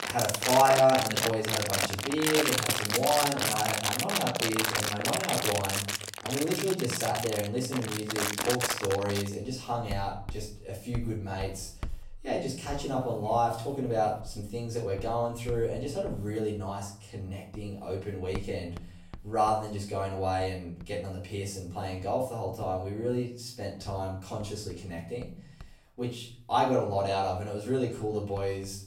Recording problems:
off-mic speech; far
room echo; slight; dies away in 0.5 s
household noises; very loud; throughout; 1 dB above the speech

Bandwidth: 16 kHz